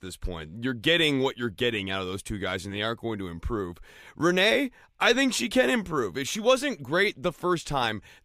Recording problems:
none

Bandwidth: 15 kHz